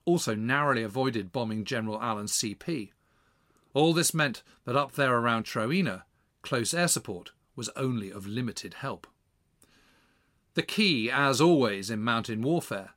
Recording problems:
none

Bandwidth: 16 kHz